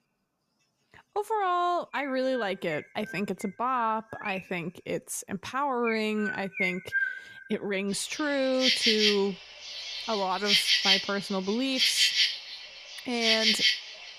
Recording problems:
animal sounds; very loud; throughout; 5 dB above the speech

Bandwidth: 14.5 kHz